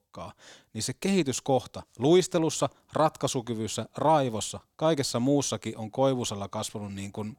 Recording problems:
none

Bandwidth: 18.5 kHz